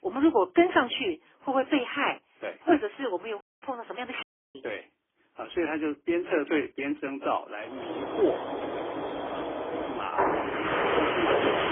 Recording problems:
phone-call audio; poor line; nothing above 3.5 kHz
garbled, watery; badly
animal sounds; loud; from 7.5 s on; as loud as the speech
audio cutting out; at 3.5 s and at 4 s

